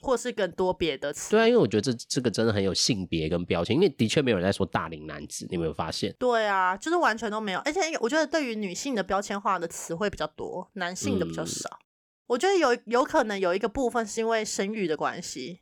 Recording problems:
none

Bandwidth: 18.5 kHz